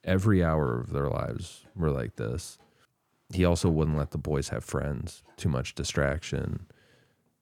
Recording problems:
none

